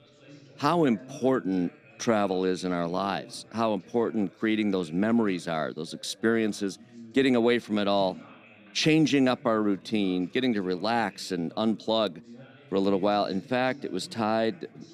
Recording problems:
background chatter; faint; throughout; 3 voices, 25 dB below the speech

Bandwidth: 14.5 kHz